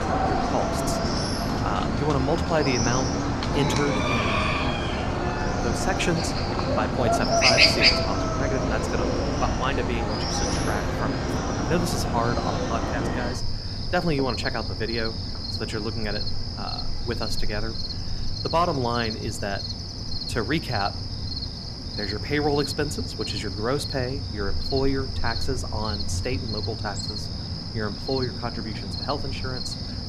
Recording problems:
animal sounds; very loud; throughout; 3 dB above the speech

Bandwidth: 14.5 kHz